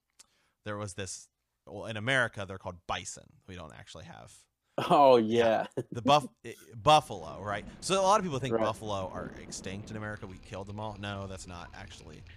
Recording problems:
rain or running water; faint; from 7 s on; 20 dB below the speech

